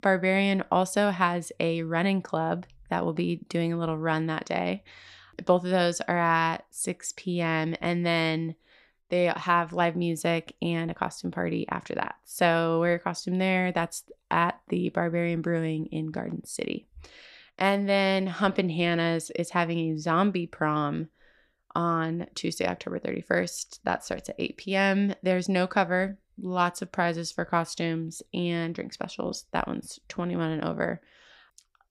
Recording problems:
none

